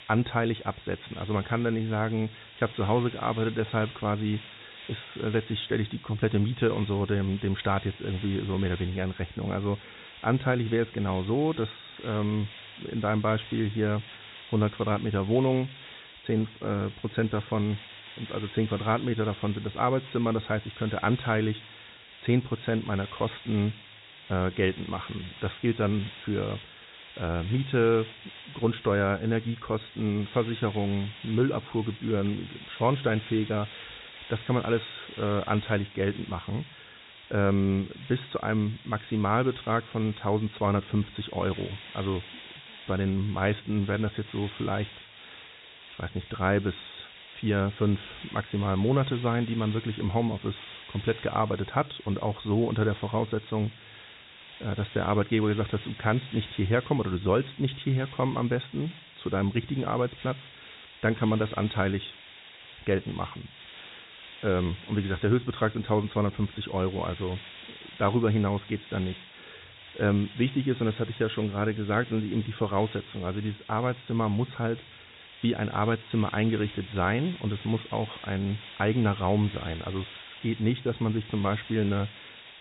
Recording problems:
high frequencies cut off; severe; nothing above 4 kHz
hiss; noticeable; throughout; 15 dB below the speech

